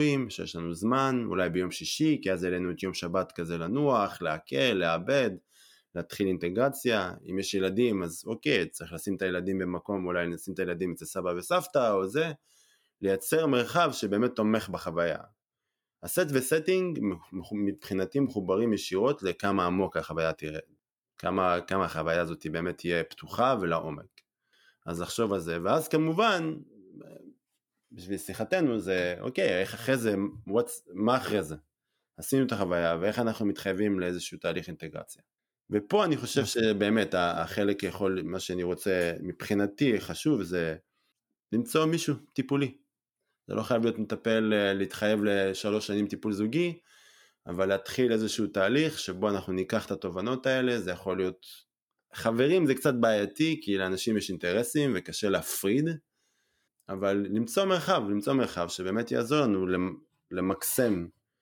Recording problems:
abrupt cut into speech; at the start

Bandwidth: 18.5 kHz